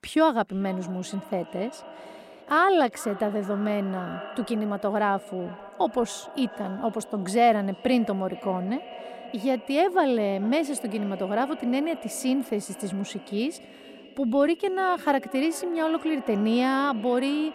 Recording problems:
echo of what is said; noticeable; throughout; 440 ms later, 15 dB below the speech

